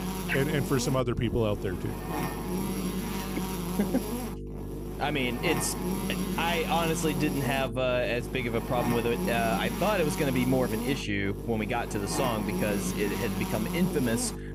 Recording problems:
electrical hum; loud; throughout; 50 Hz, 6 dB below the speech

